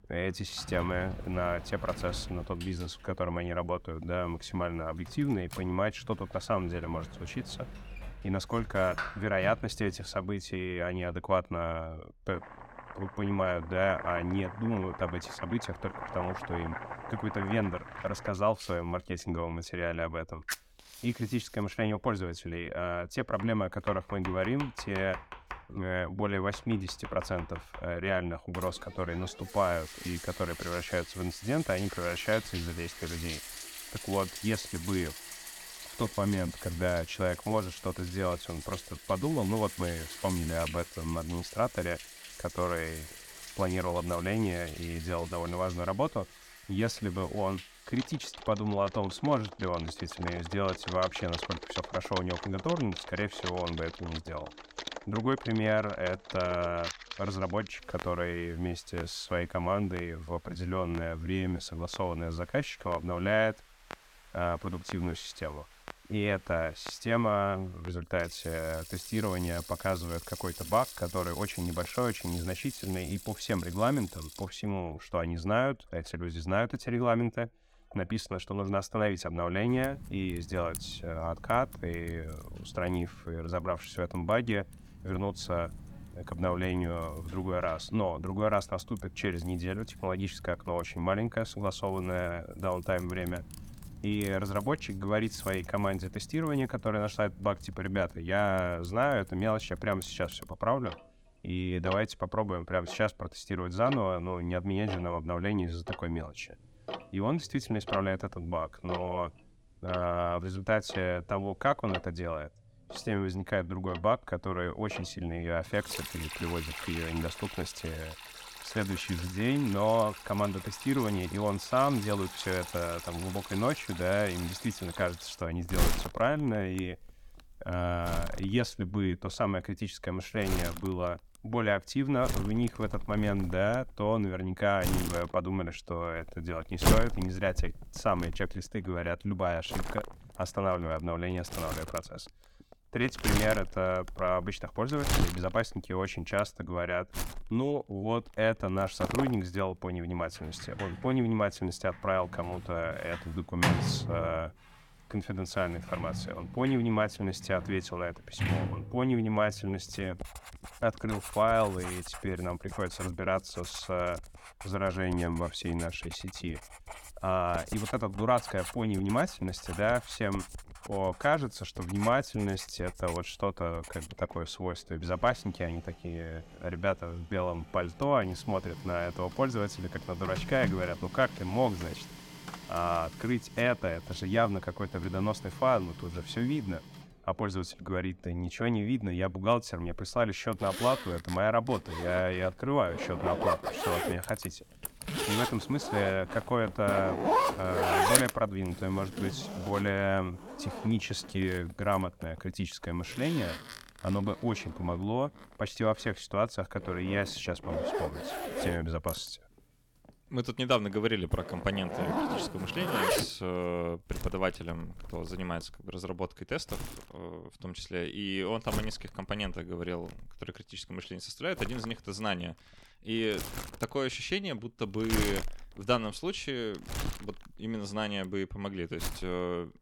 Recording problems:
household noises; loud; throughout; 7 dB below the speech

